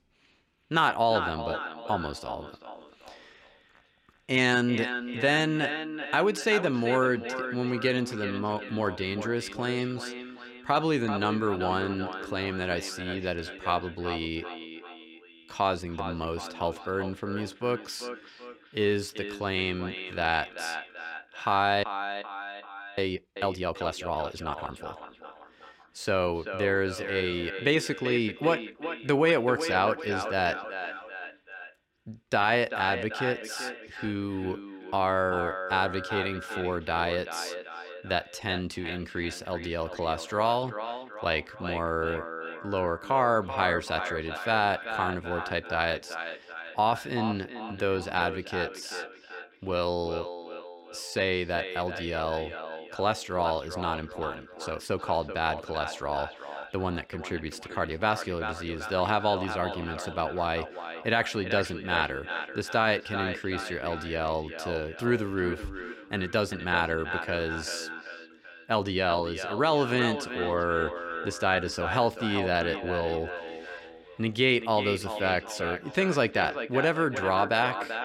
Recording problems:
echo of what is said; strong; throughout; 390 ms later, 8 dB below the speech
audio freezing; at 22 s for 1 s

